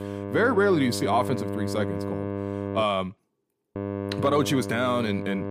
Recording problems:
electrical hum; loud; until 3 s and from 4 s on; 50 Hz, 9 dB below the speech

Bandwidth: 15 kHz